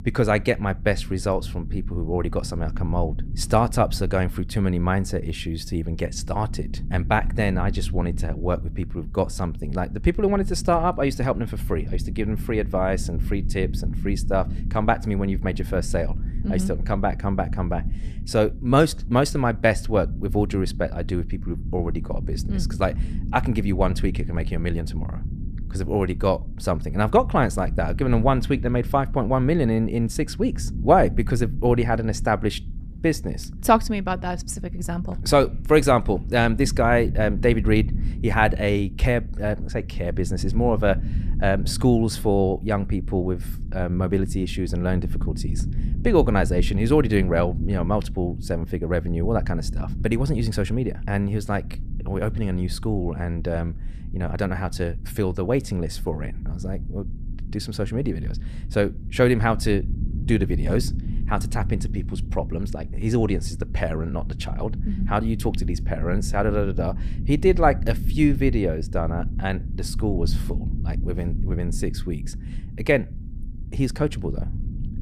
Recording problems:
low rumble; noticeable; throughout; 20 dB below the speech

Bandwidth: 14.5 kHz